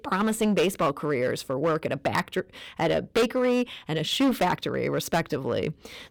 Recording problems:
distortion; heavy; 8% of the sound clipped

